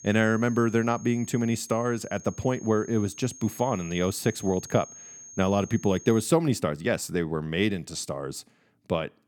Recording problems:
high-pitched whine; noticeable; until 6.5 s; 6.5 kHz, 15 dB below the speech

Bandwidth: 18 kHz